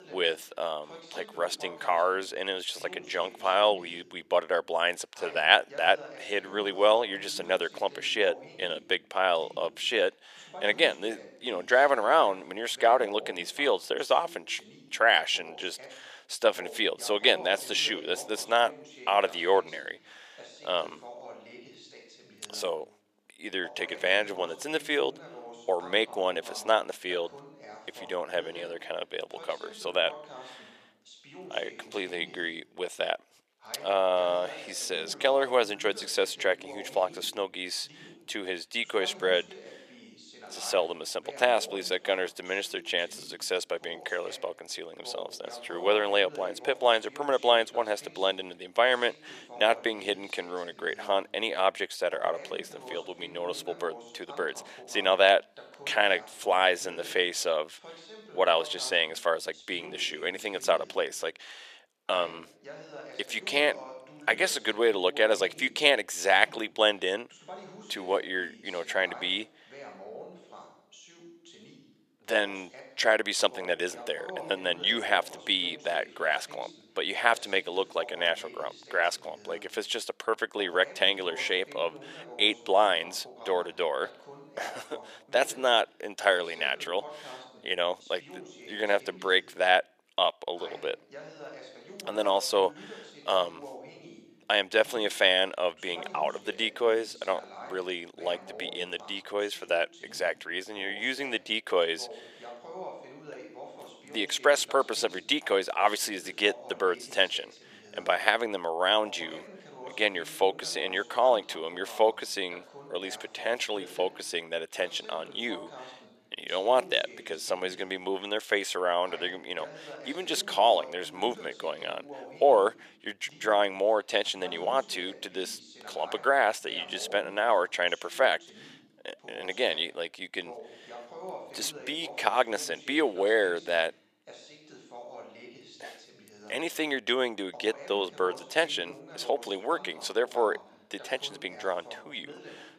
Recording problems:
thin; somewhat; fading below 500 Hz
voice in the background; noticeable; throughout; 20 dB below the speech

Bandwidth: 14.5 kHz